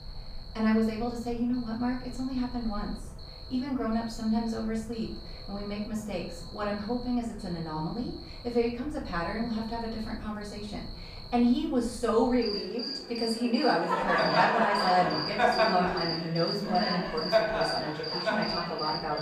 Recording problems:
off-mic speech; far
room echo; slight; dies away in 0.5 s
animal sounds; very loud; throughout; 1 dB above the speech

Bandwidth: 15 kHz